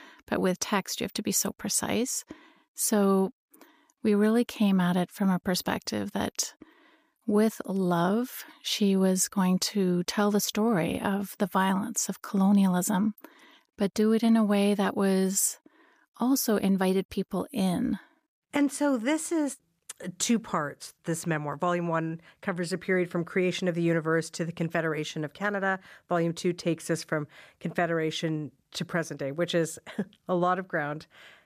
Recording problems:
none

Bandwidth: 15 kHz